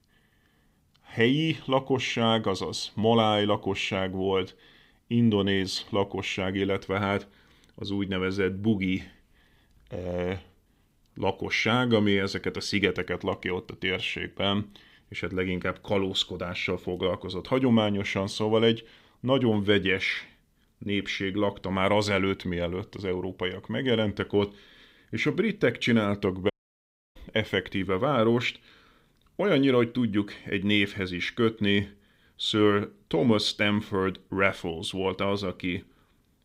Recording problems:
audio cutting out; at 27 s for 0.5 s

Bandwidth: 15.5 kHz